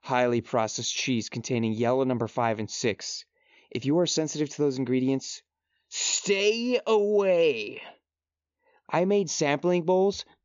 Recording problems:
high frequencies cut off; noticeable; nothing above 7 kHz

